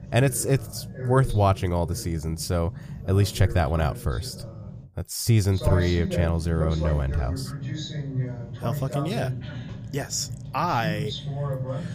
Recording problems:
voice in the background; loud; throughout; 8 dB below the speech

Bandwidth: 15 kHz